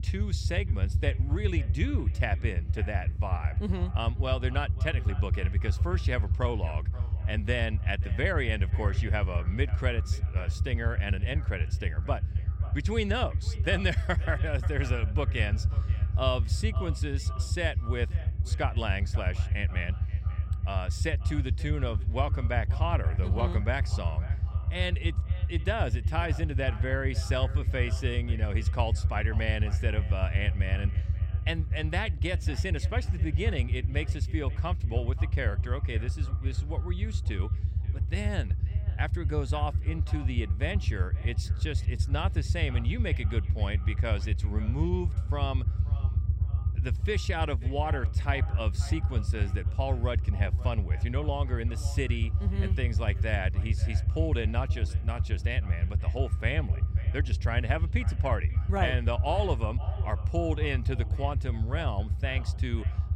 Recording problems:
echo of what is said; noticeable; throughout; 530 ms later, 20 dB below the speech
low rumble; noticeable; throughout; 10 dB below the speech

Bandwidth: 16 kHz